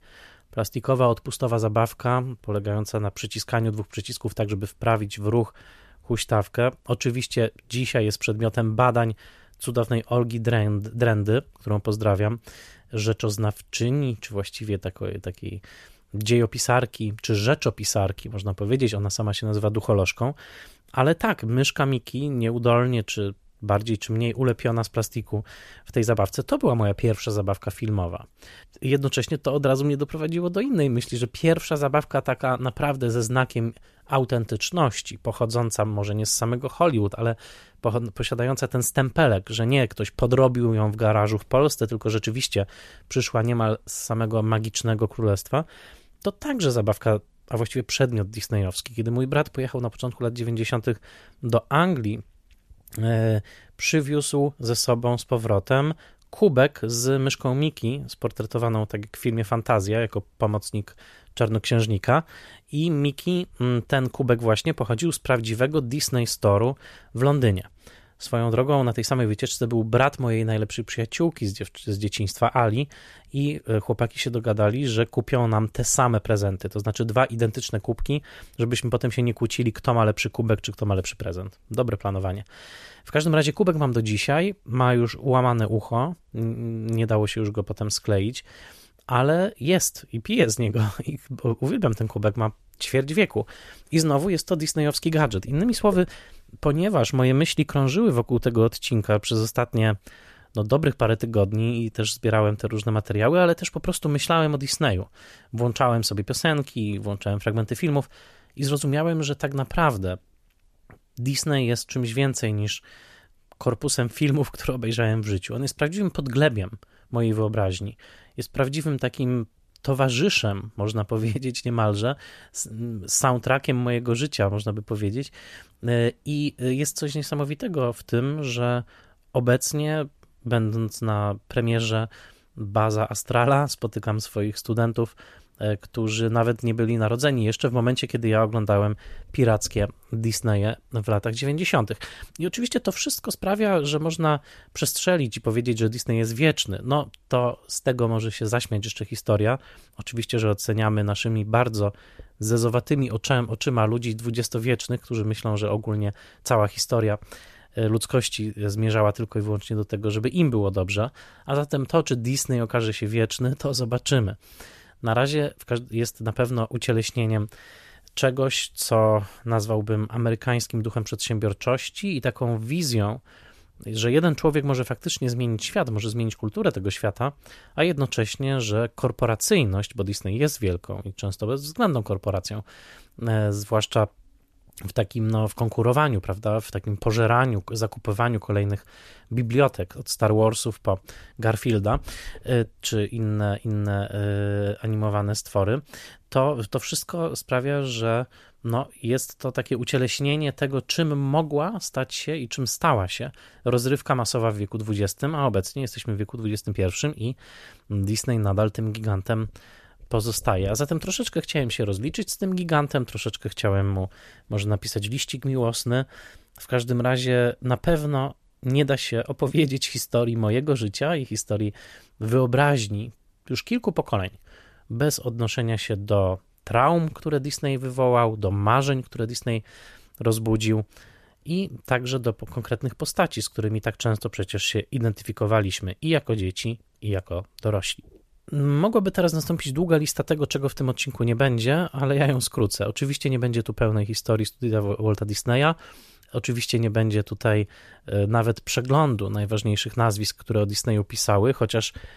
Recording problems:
none

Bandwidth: 14.5 kHz